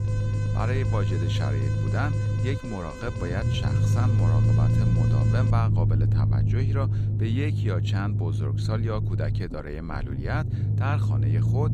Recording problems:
low rumble; loud; throughout; 2 dB below the speech
alarm; noticeable; until 5.5 s; peak 7 dB below the speech

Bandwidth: 15 kHz